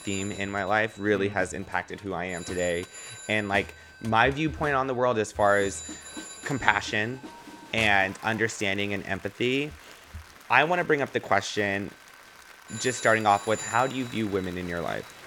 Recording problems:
alarms or sirens; noticeable; throughout; 15 dB below the speech
crowd noise; noticeable; throughout; 20 dB below the speech

